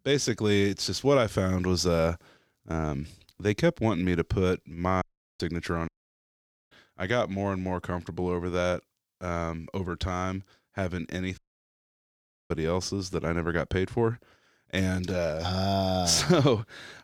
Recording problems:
audio cutting out; at 5 s, at 6 s for 1 s and at 11 s for 1 s

